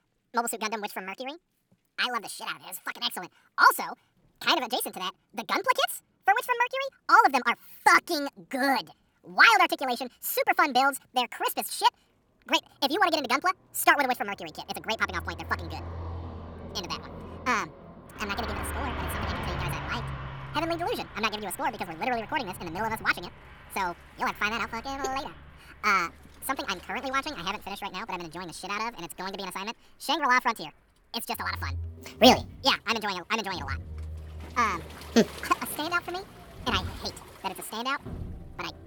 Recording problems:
wrong speed and pitch; too fast and too high; 1.7 times normal speed
traffic noise; noticeable; from 12 s on; 15 dB below the speech
rain or running water; faint; throughout; 25 dB below the speech

